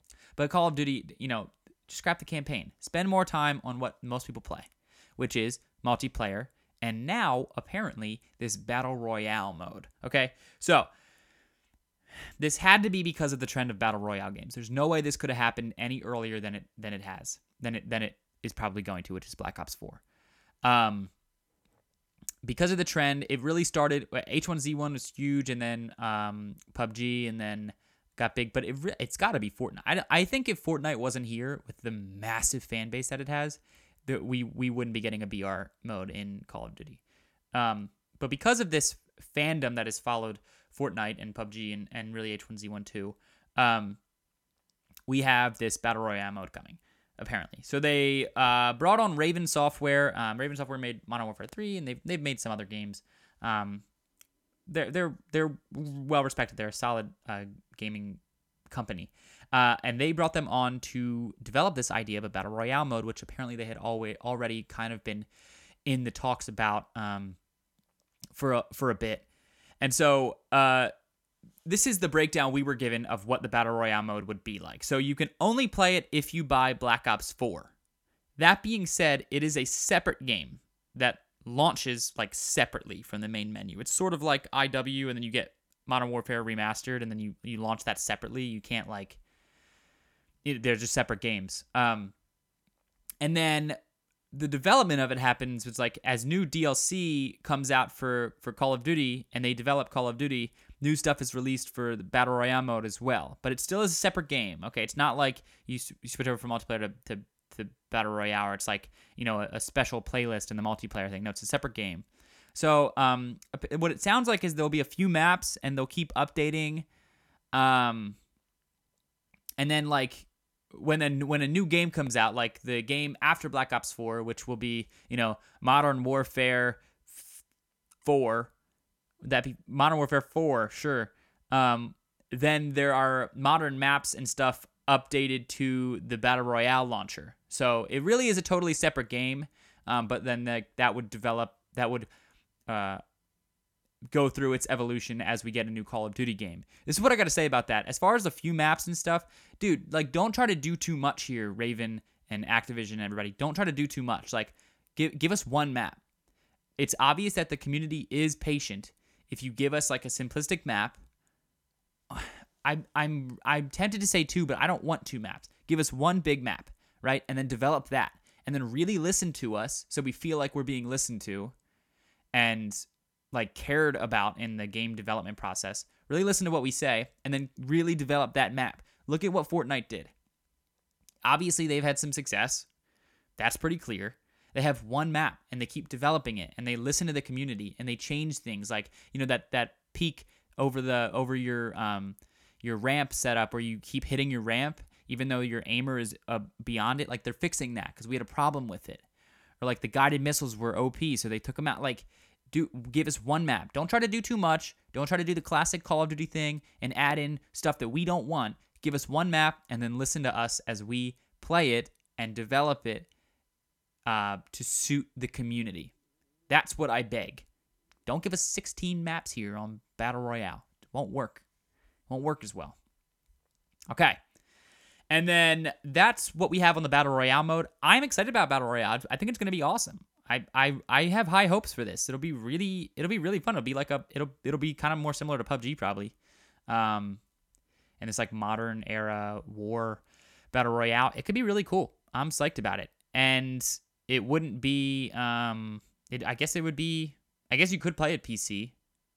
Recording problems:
none

